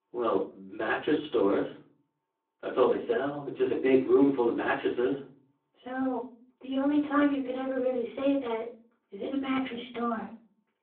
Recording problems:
off-mic speech; far
room echo; slight; dies away in 0.4 s
phone-call audio

